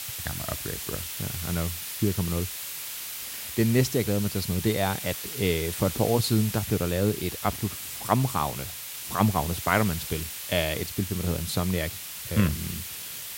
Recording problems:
hiss; loud; throughout; 6 dB below the speech

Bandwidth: 16 kHz